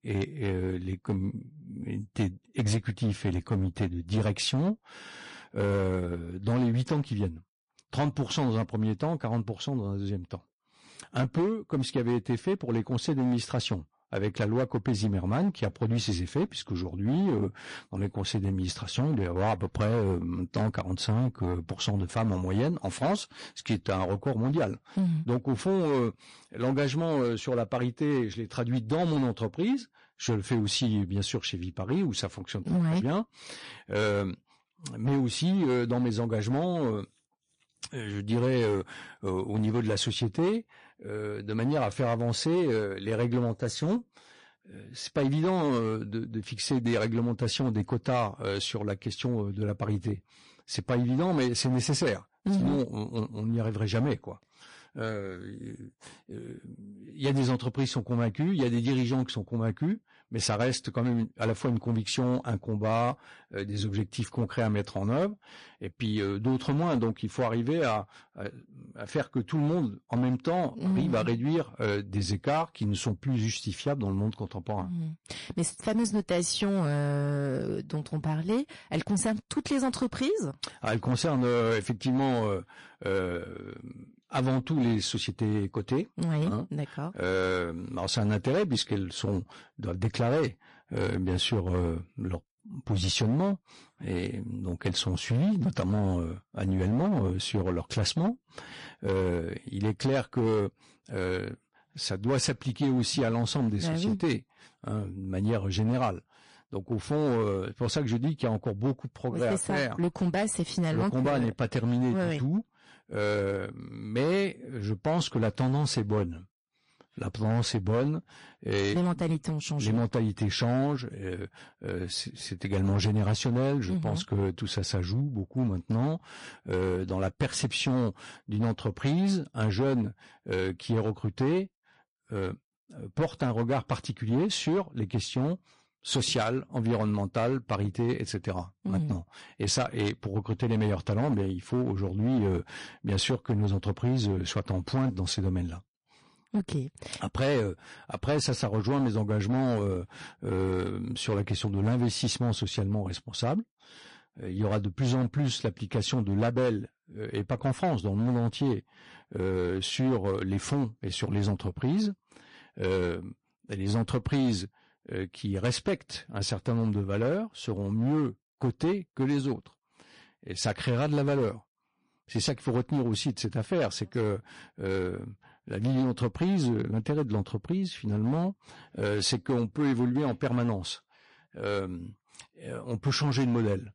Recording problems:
distortion; slight; 9% of the sound clipped
garbled, watery; slightly; nothing above 10.5 kHz

